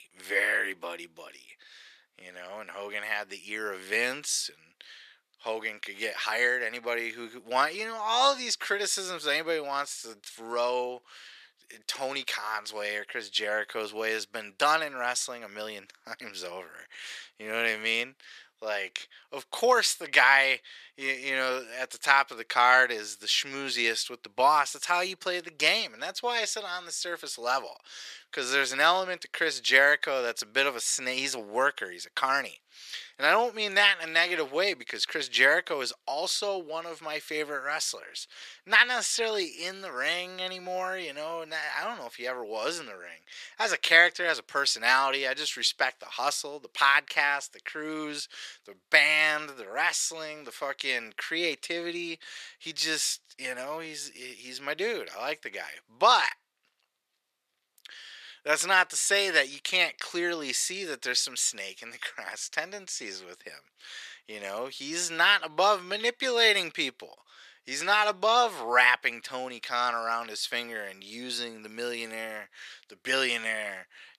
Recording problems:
thin; very; fading below 400 Hz

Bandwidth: 14 kHz